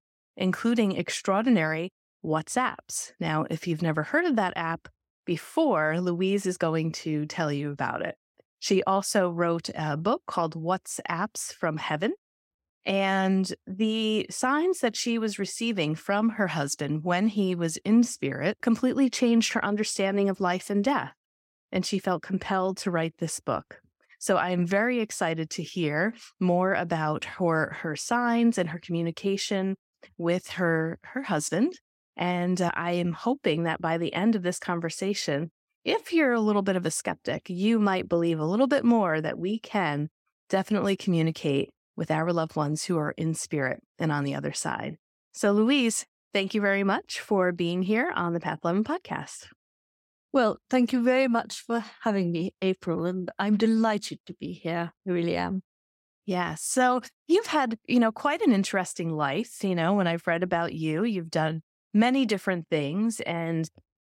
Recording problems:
none

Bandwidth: 16.5 kHz